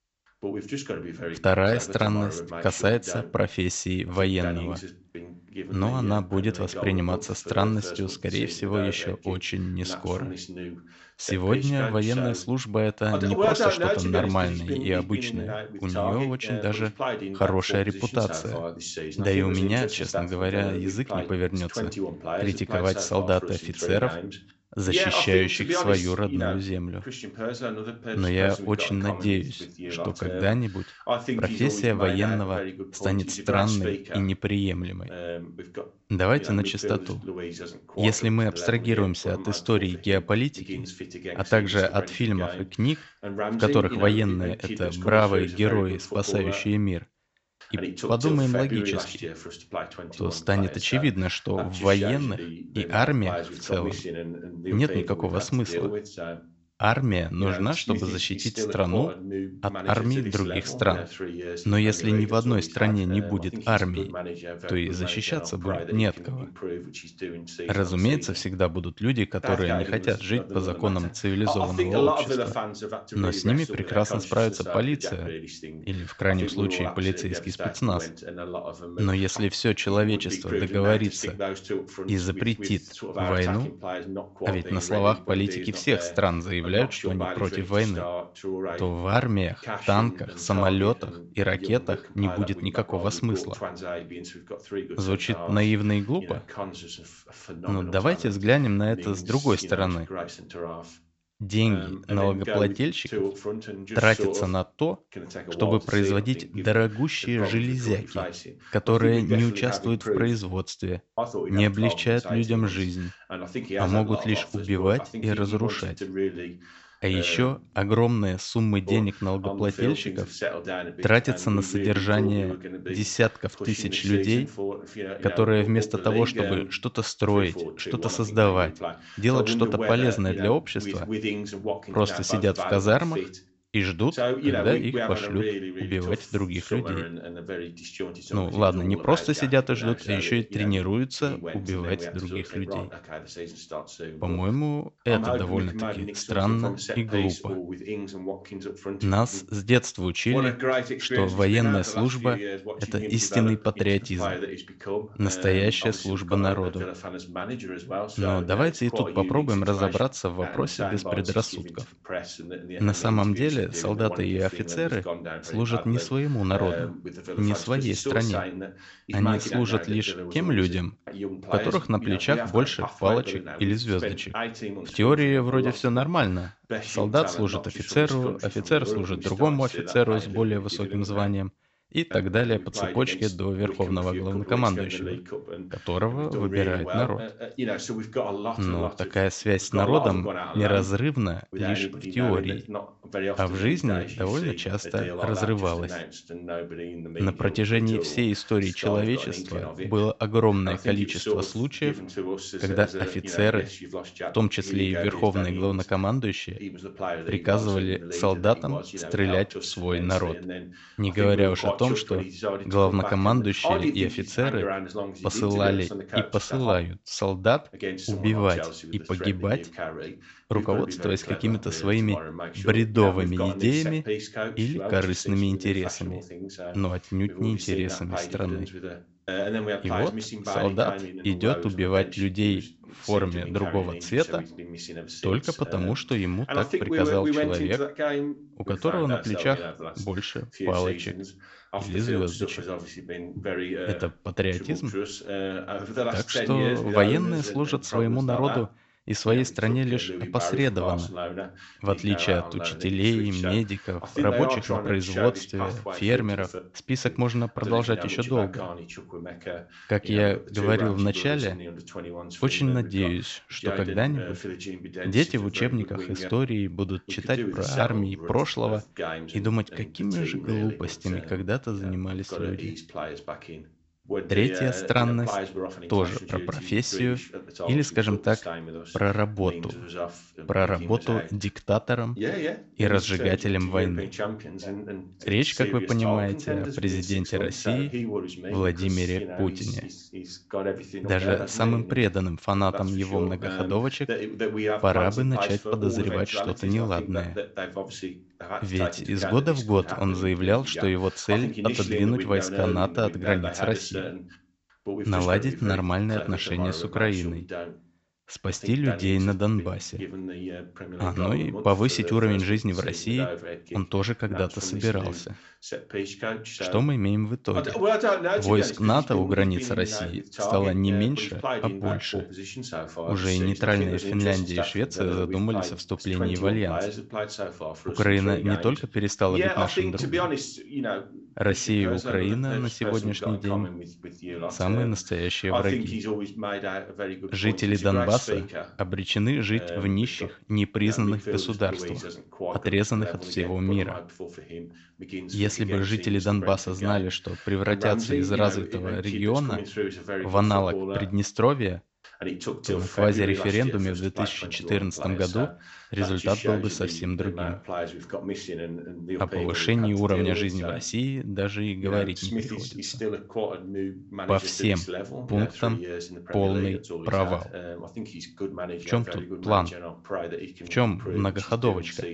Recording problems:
high frequencies cut off; noticeable; nothing above 7.5 kHz
voice in the background; loud; throughout; 7 dB below the speech

